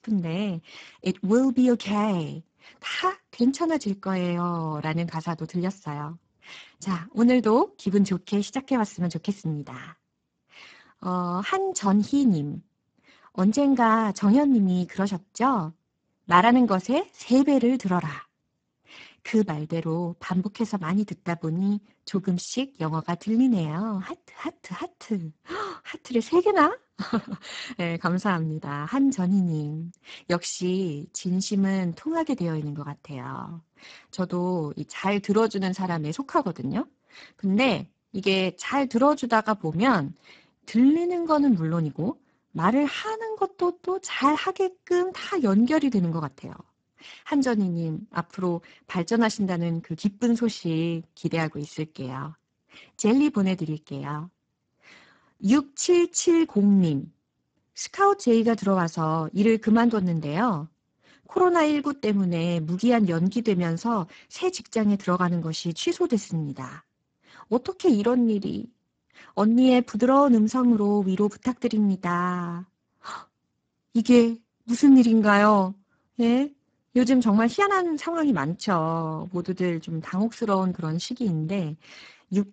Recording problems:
garbled, watery; badly; nothing above 7.5 kHz

